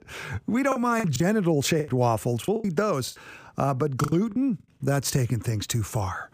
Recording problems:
choppy; very; 8% of the speech affected

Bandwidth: 15 kHz